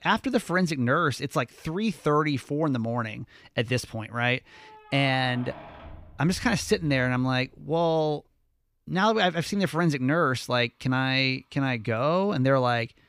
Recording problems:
household noises; faint; throughout; 20 dB below the speech

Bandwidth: 15 kHz